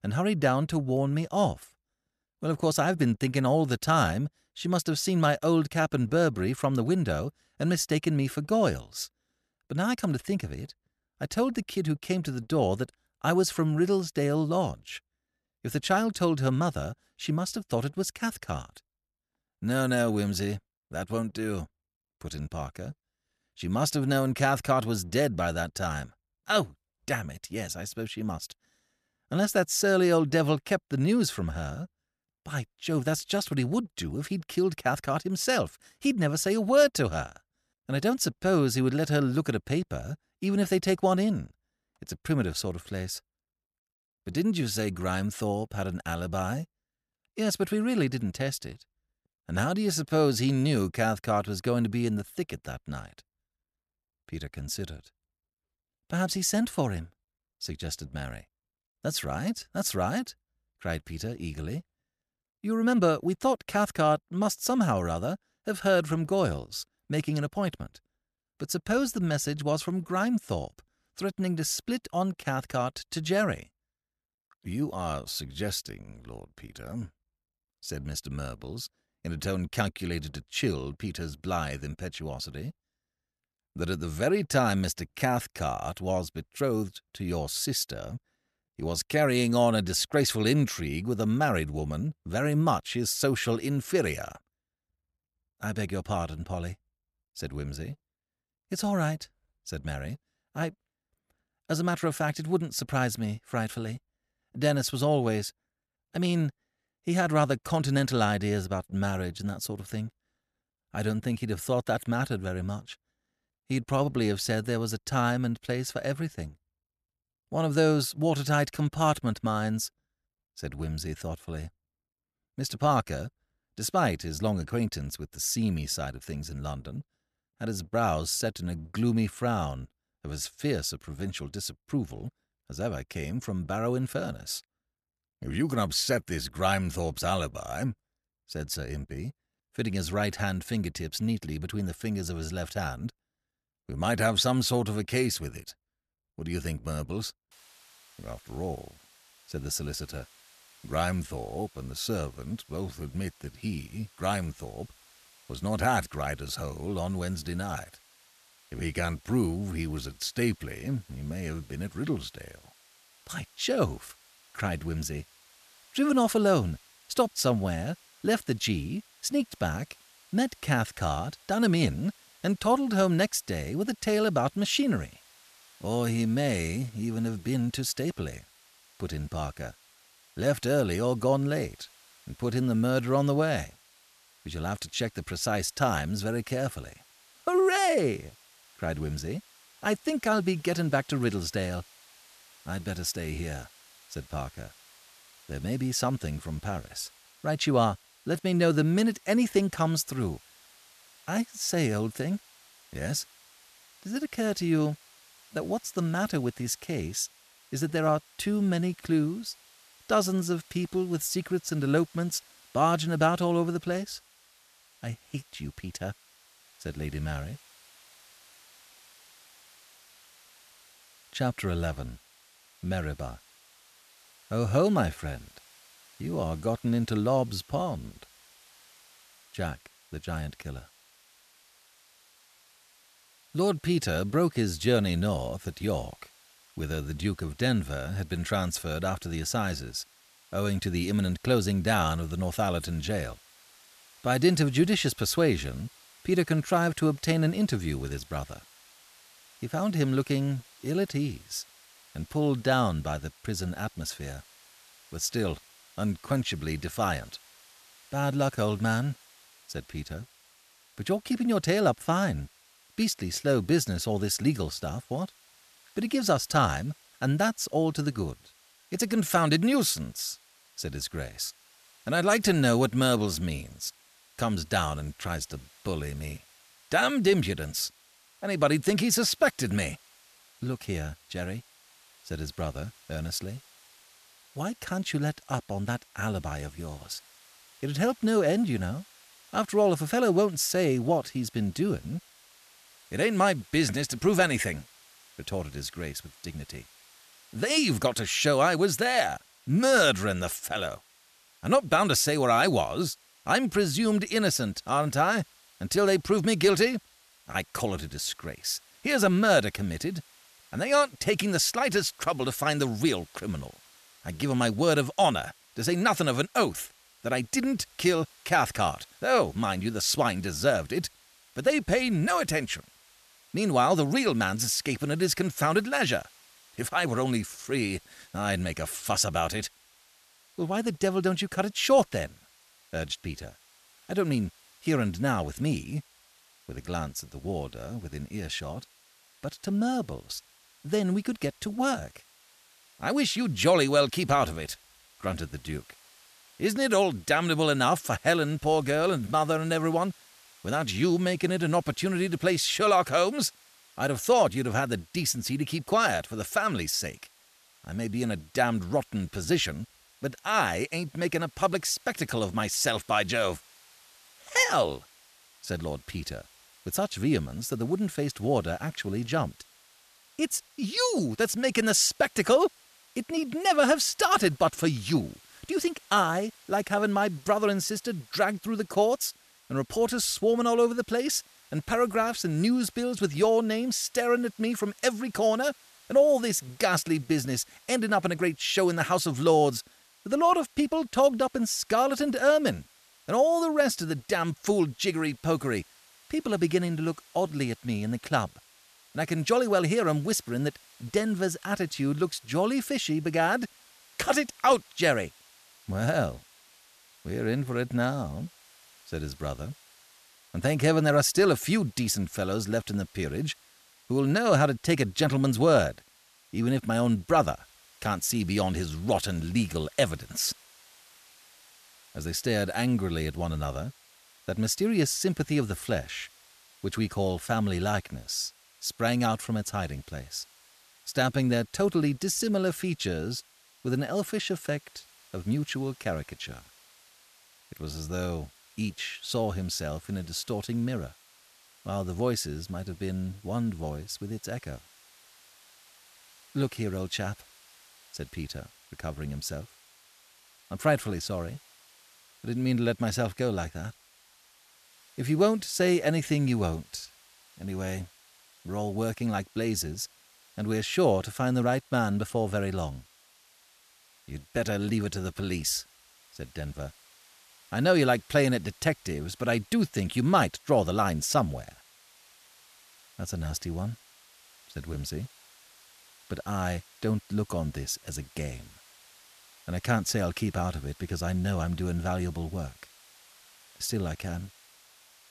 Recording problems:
hiss; faint; from 2:28 on; 25 dB below the speech

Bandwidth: 14 kHz